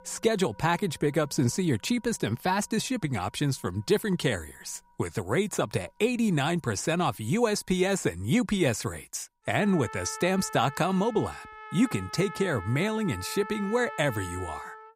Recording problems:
background music; noticeable; throughout; 15 dB below the speech

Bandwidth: 15.5 kHz